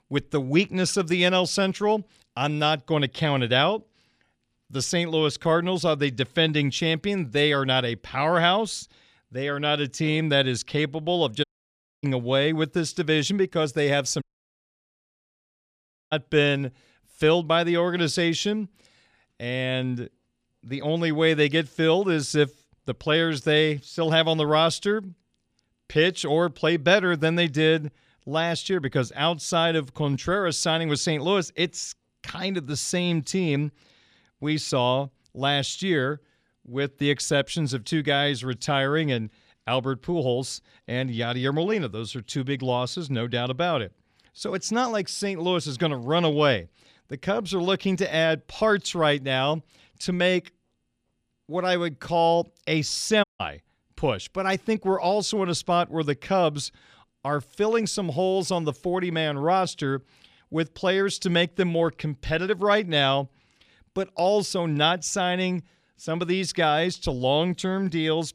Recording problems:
audio cutting out; at 11 s for 0.5 s, at 14 s for 2 s and at 53 s

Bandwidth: 14.5 kHz